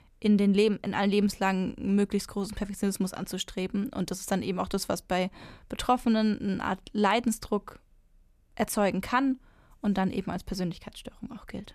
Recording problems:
none

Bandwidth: 14.5 kHz